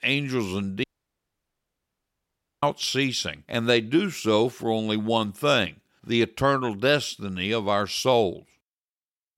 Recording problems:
audio cutting out; at 1 s for 2 s

